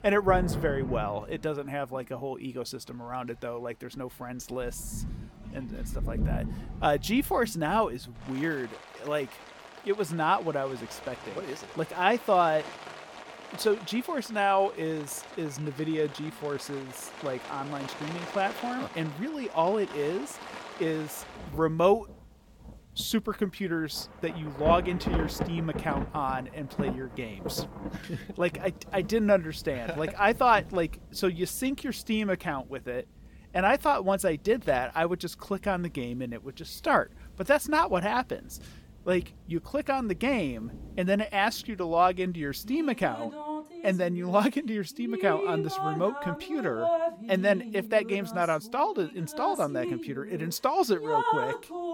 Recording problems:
rain or running water; loud; throughout; 9 dB below the speech

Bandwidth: 17 kHz